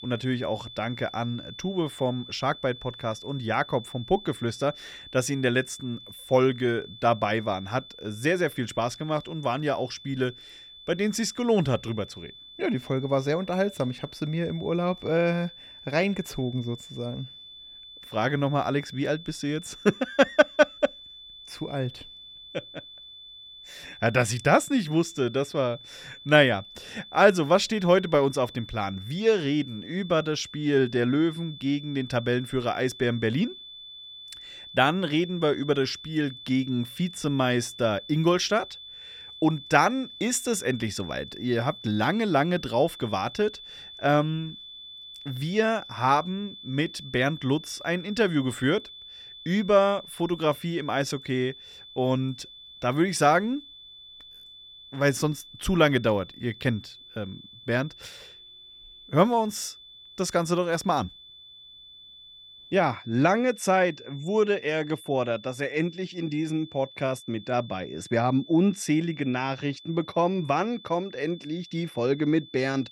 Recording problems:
high-pitched whine; noticeable; throughout; 3.5 kHz, 15 dB below the speech

